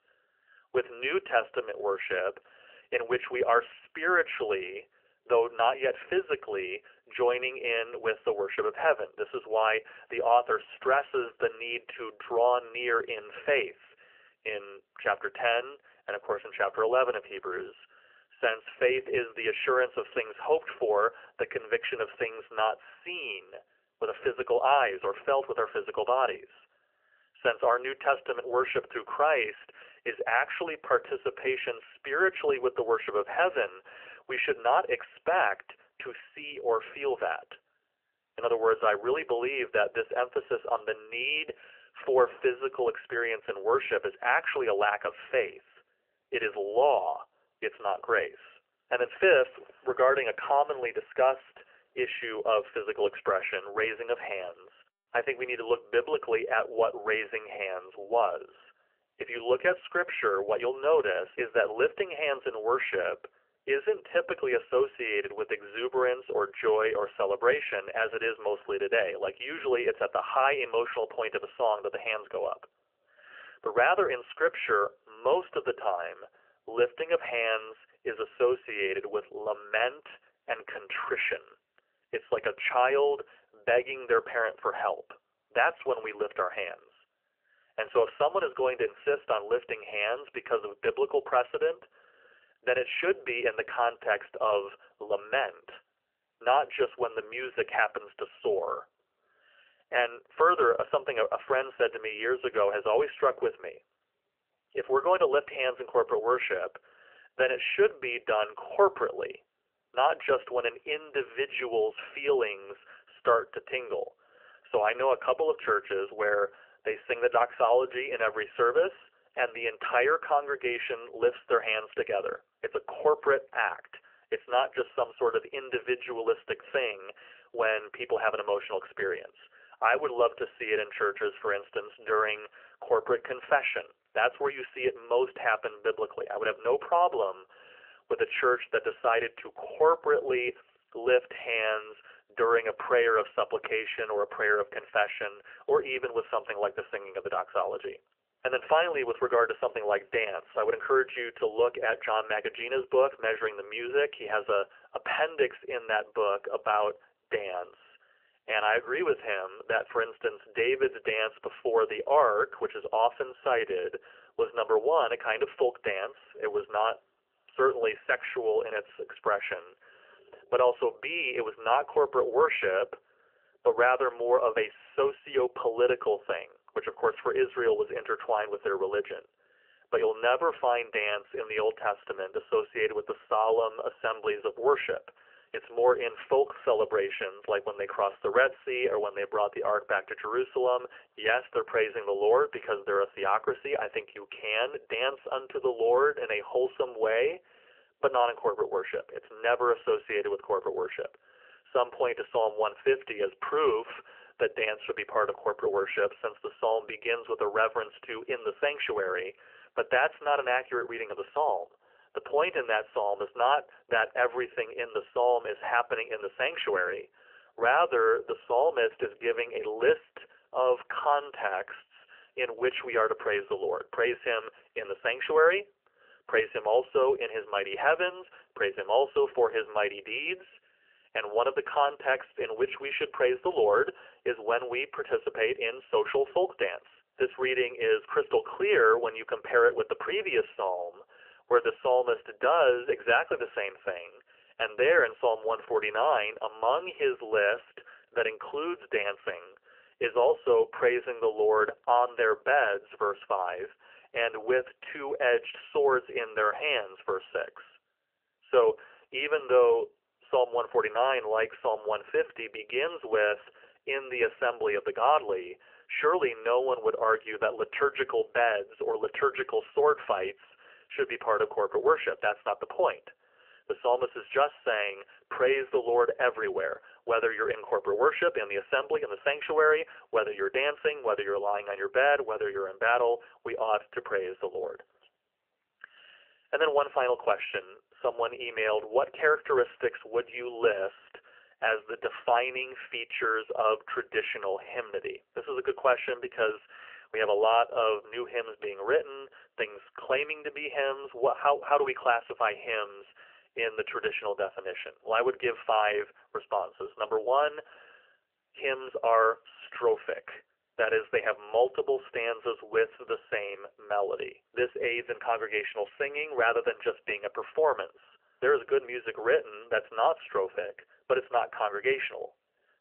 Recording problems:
phone-call audio; nothing above 3 kHz

